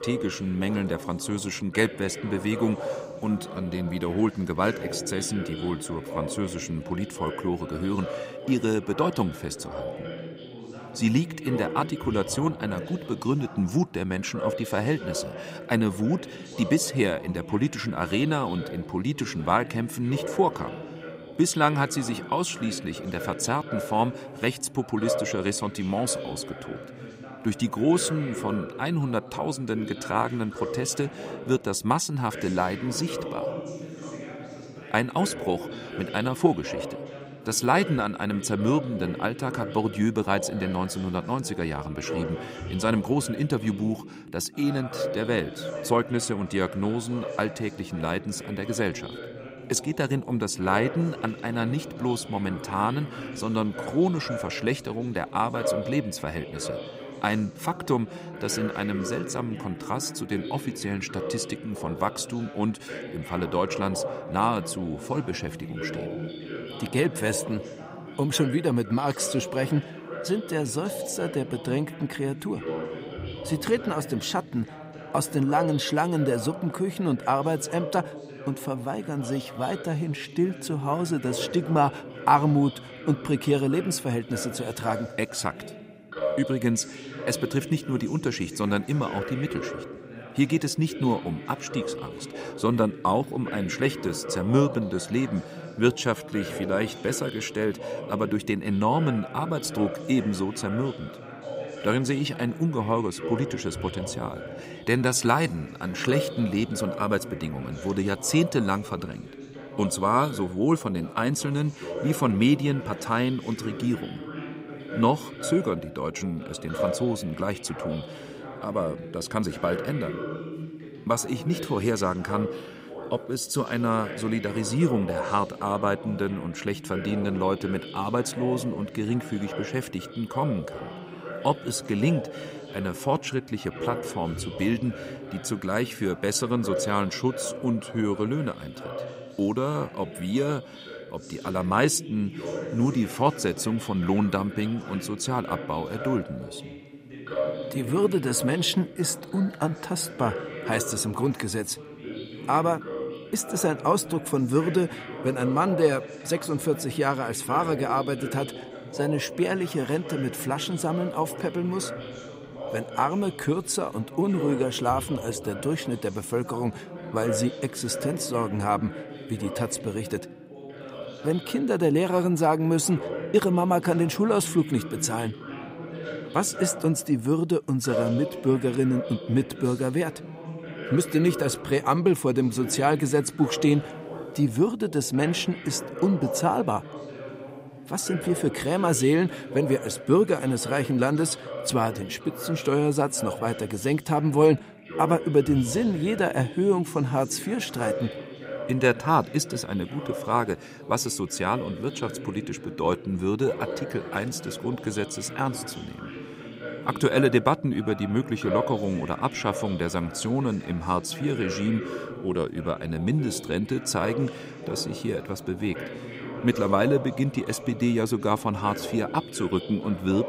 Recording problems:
background chatter; loud; throughout; 2 voices, 10 dB below the speech

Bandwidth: 15.5 kHz